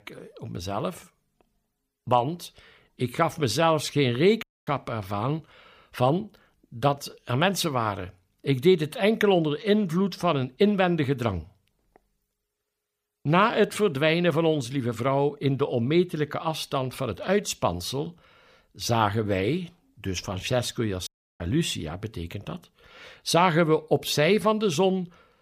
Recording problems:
audio cutting out; at 4.5 s and at 21 s

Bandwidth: 15 kHz